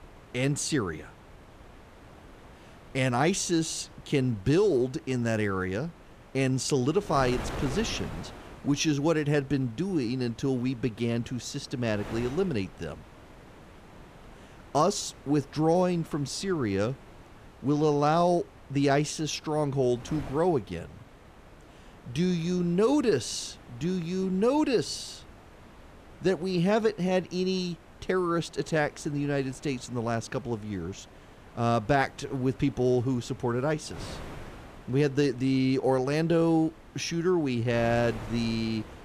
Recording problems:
wind noise on the microphone; occasional gusts; 20 dB below the speech

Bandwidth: 14.5 kHz